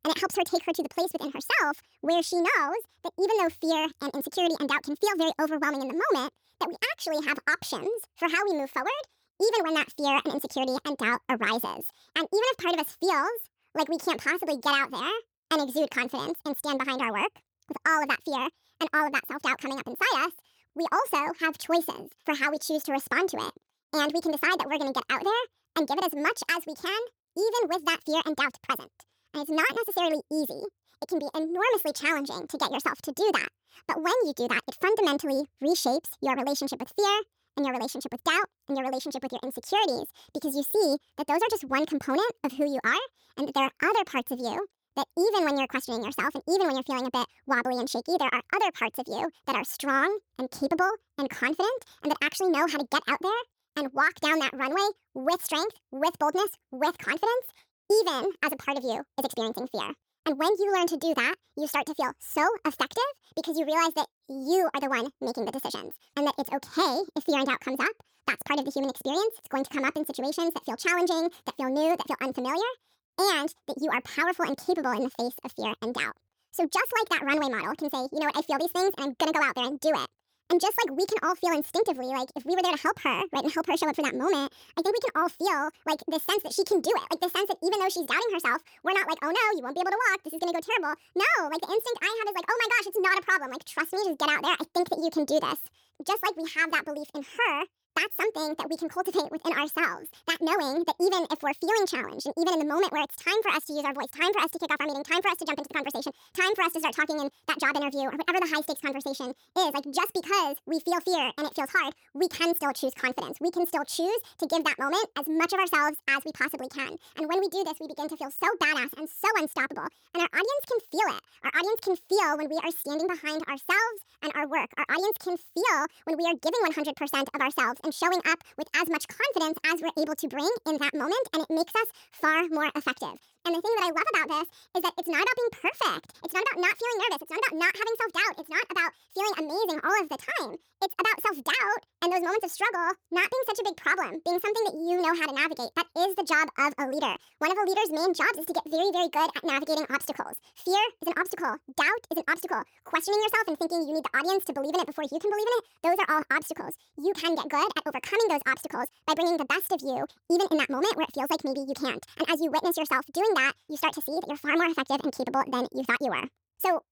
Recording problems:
wrong speed and pitch; too fast and too high; 1.6 times normal speed

